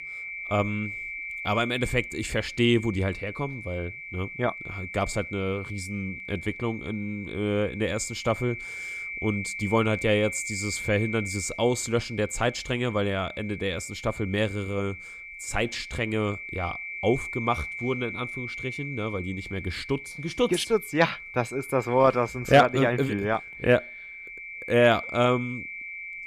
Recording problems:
high-pitched whine; loud; throughout; 2.5 kHz, 9 dB below the speech

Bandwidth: 14.5 kHz